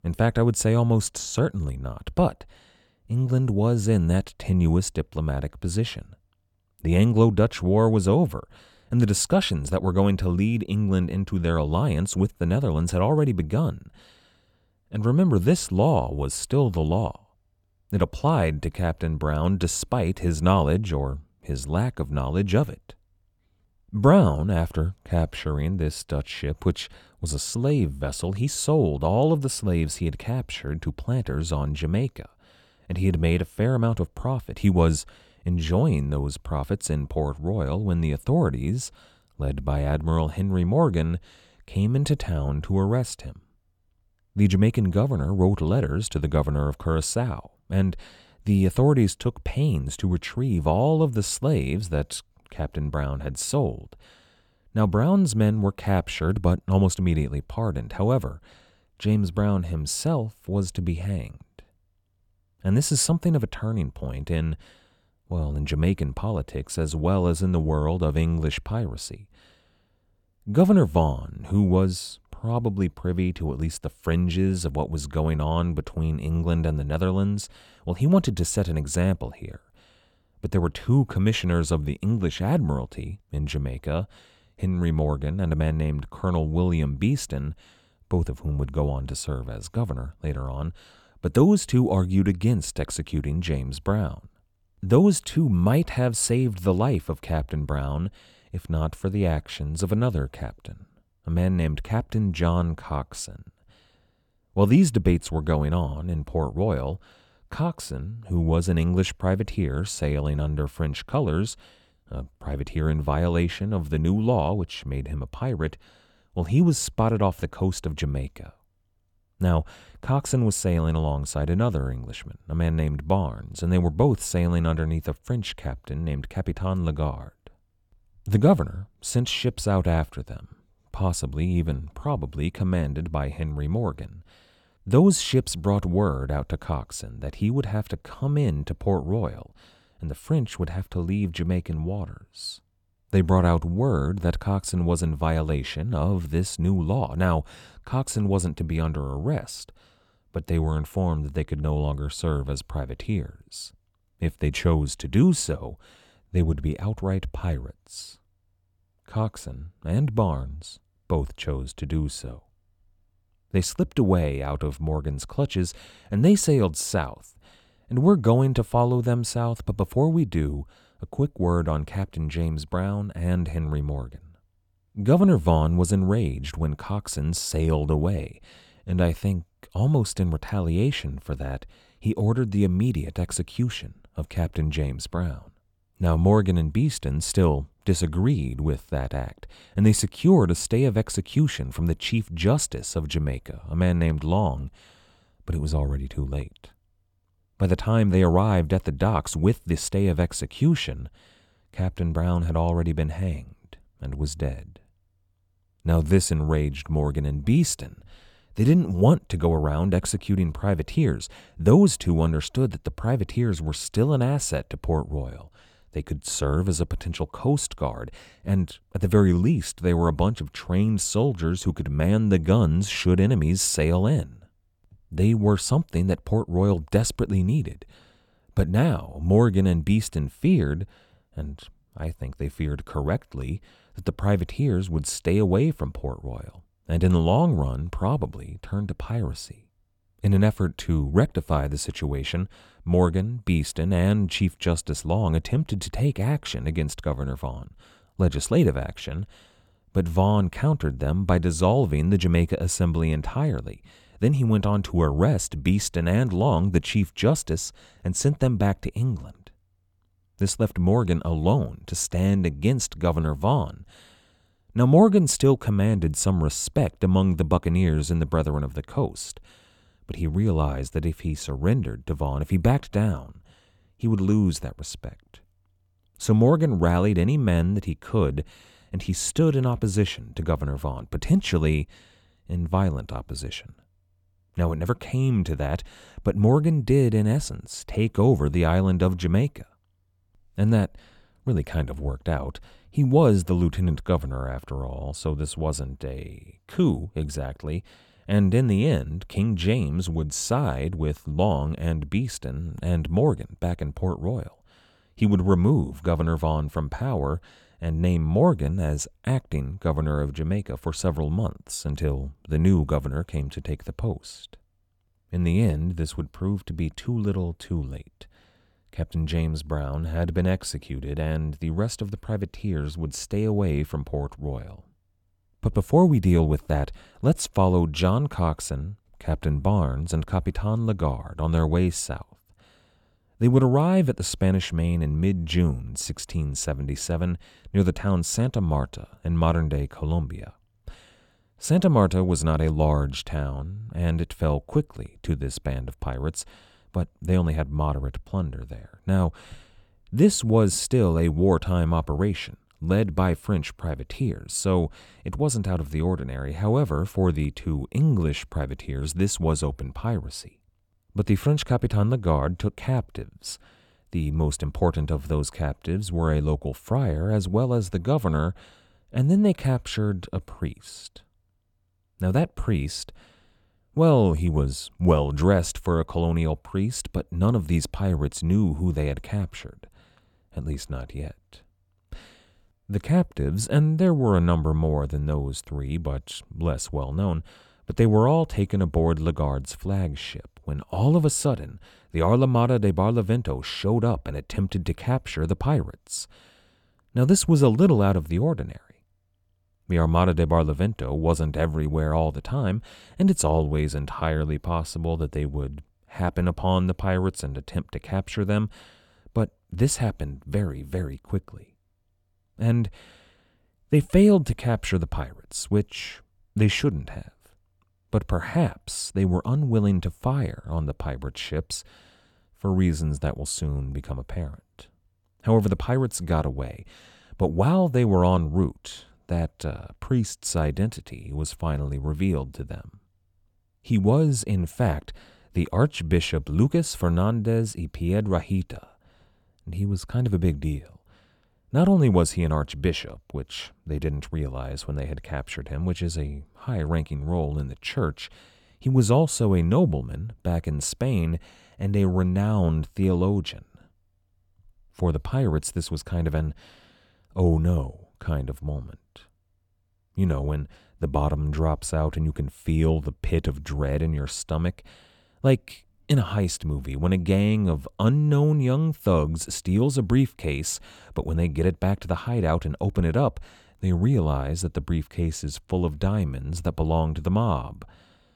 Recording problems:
none

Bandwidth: 17.5 kHz